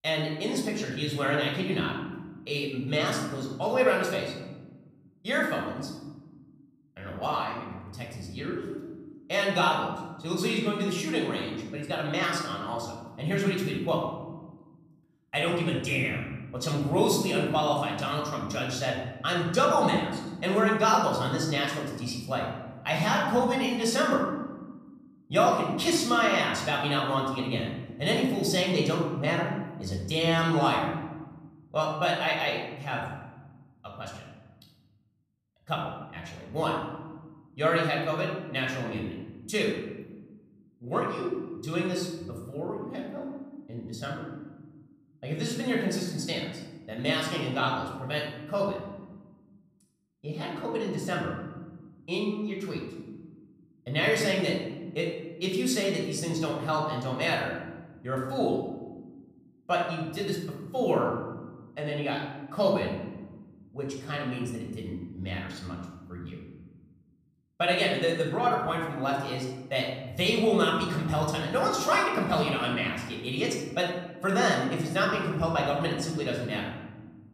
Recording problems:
room echo; noticeable; dies away in 1.2 s
off-mic speech; somewhat distant

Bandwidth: 14.5 kHz